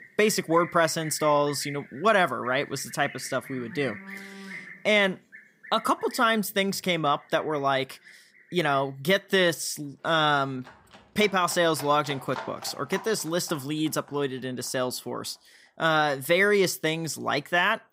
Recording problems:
animal sounds; noticeable; throughout; 20 dB below the speech

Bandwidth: 15.5 kHz